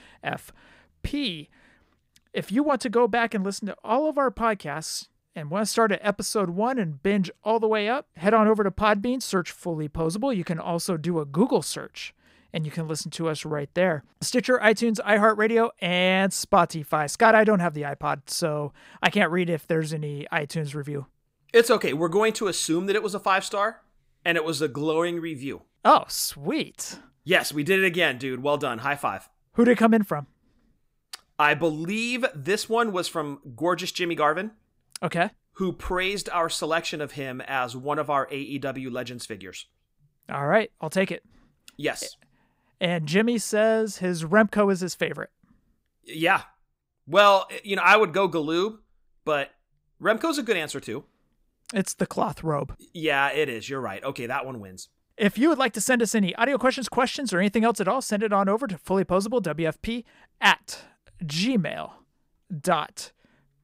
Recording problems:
none

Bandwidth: 15.5 kHz